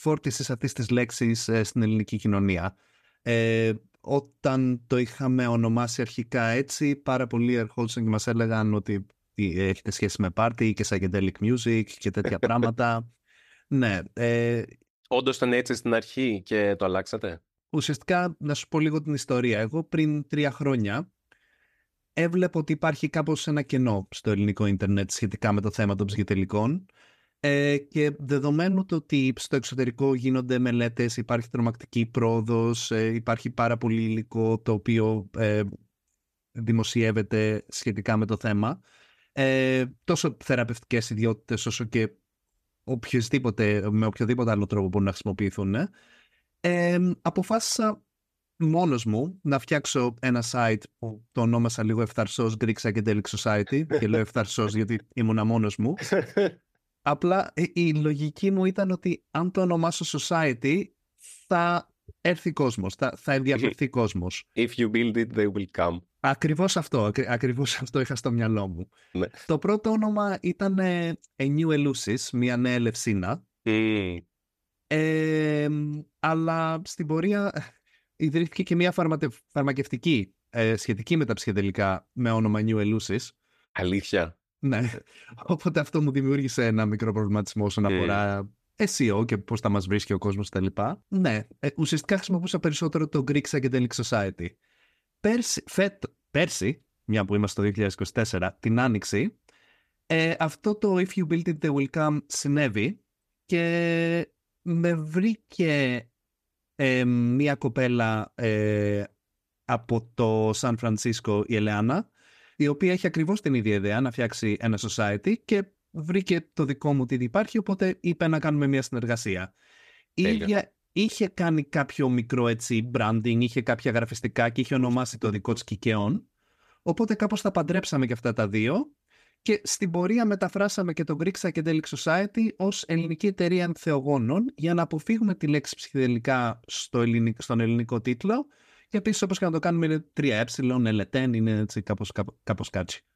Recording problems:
none

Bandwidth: 14.5 kHz